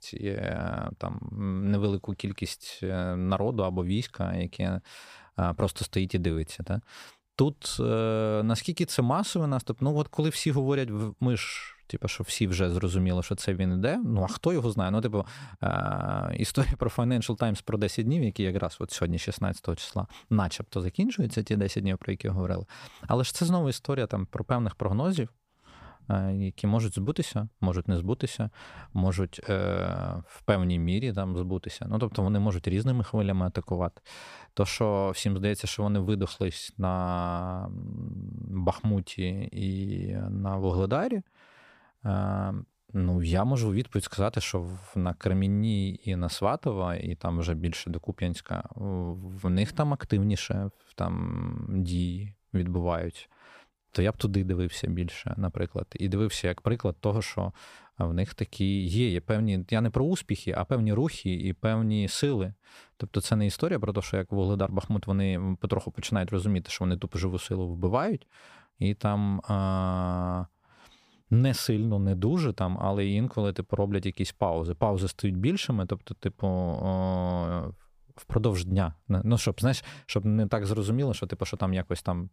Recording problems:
none

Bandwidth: 15 kHz